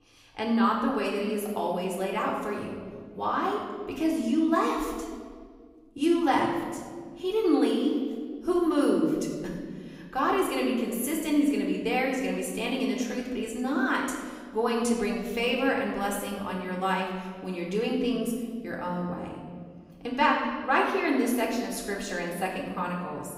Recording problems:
room echo; noticeable; dies away in 1.6 s
off-mic speech; somewhat distant

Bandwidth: 15.5 kHz